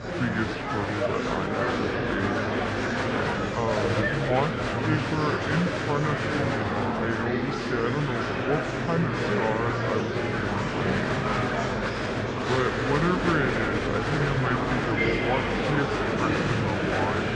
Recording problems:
wrong speed and pitch; too slow and too low; 0.7 times normal speed
muffled; very slightly; fading above 5.5 kHz
murmuring crowd; very loud; throughout; 3 dB above the speech

